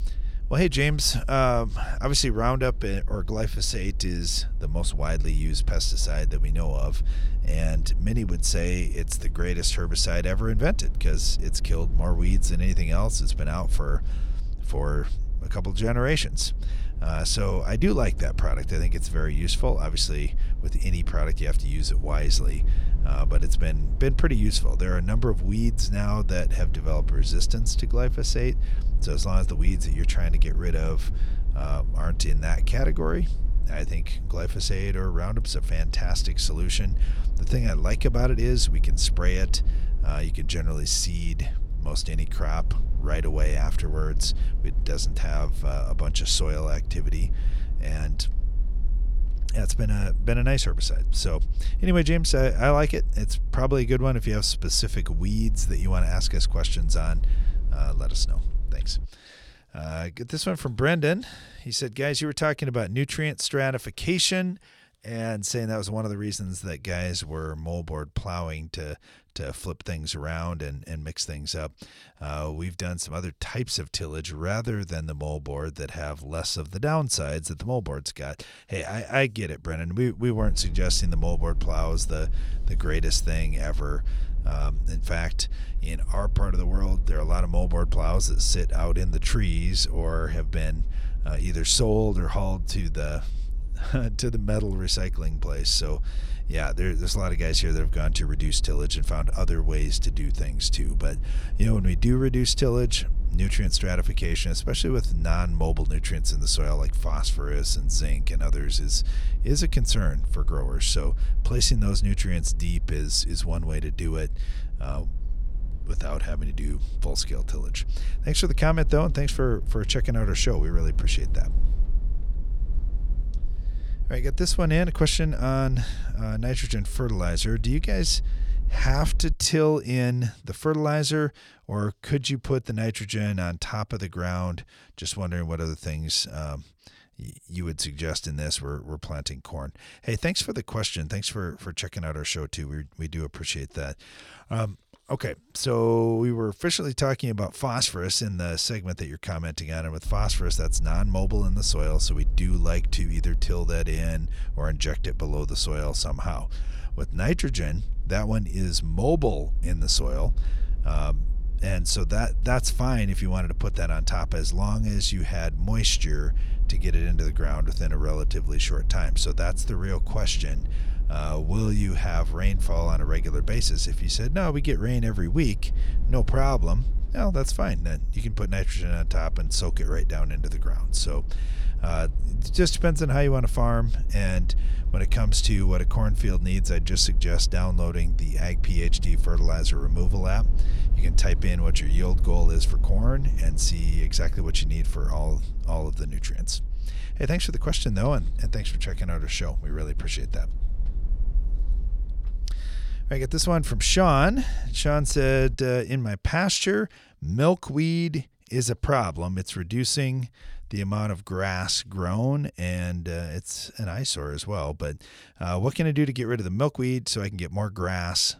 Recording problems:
low rumble; faint; until 59 s, from 1:20 to 2:09 and from 2:30 to 3:26; 20 dB below the speech

